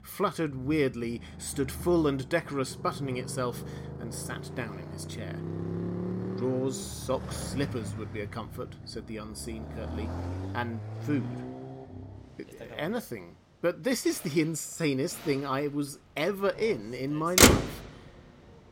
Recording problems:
traffic noise; very loud; throughout; 1 dB above the speech

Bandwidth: 16.5 kHz